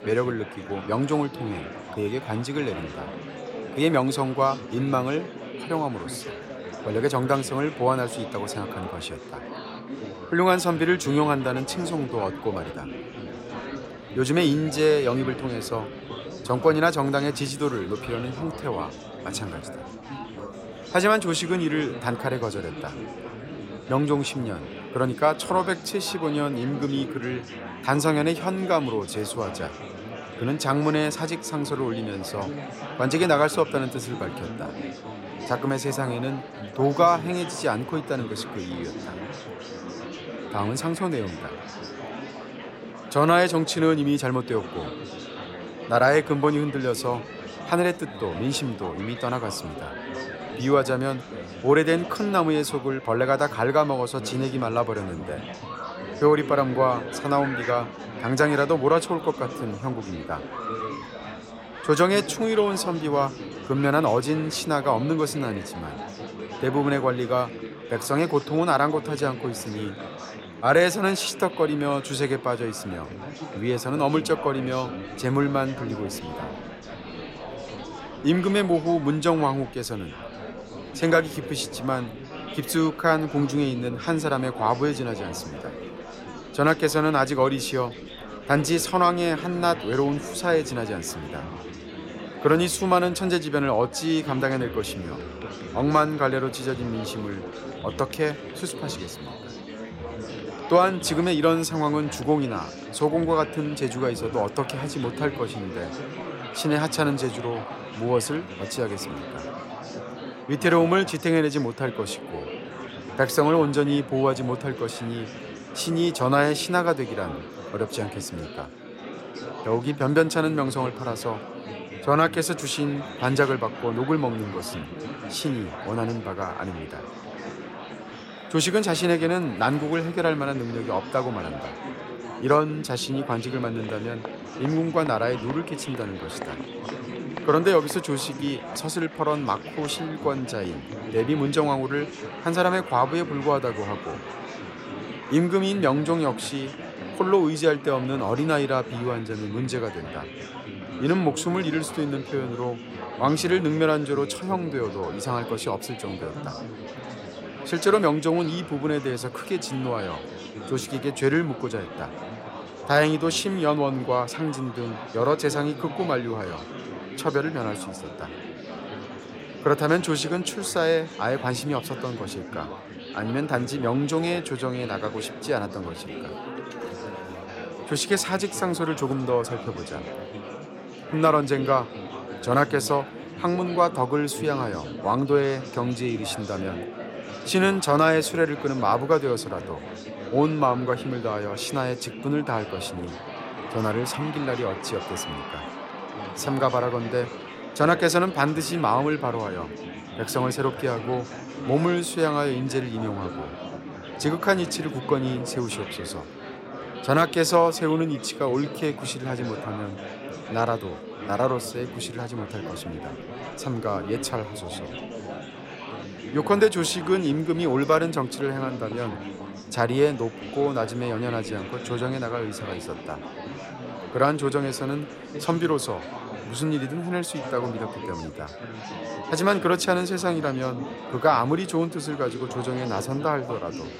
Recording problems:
chatter from many people; noticeable; throughout; 10 dB below the speech

